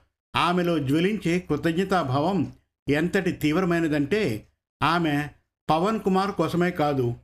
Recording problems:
squashed, flat; somewhat

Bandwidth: 14.5 kHz